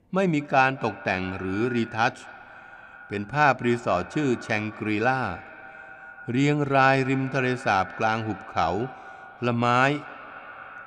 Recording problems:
echo of what is said; noticeable; throughout; 220 ms later, 15 dB below the speech

